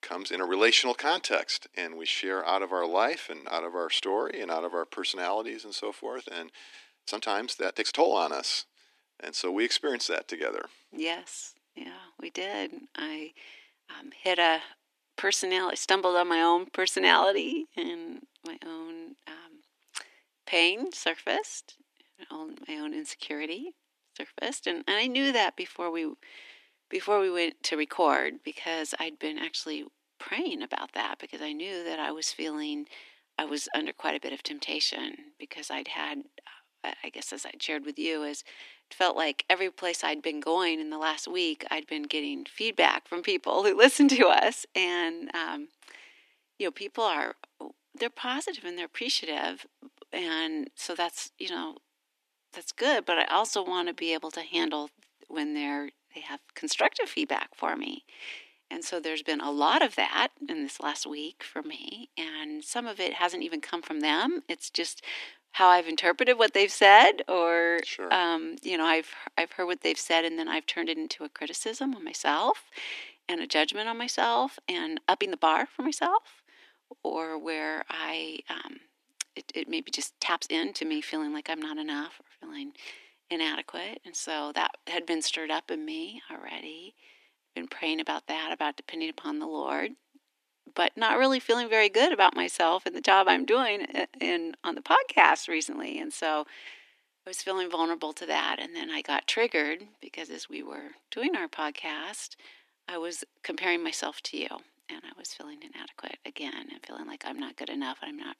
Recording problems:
thin; somewhat; fading below 250 Hz
uneven, jittery; strongly; from 7 s to 1:21

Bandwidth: 14 kHz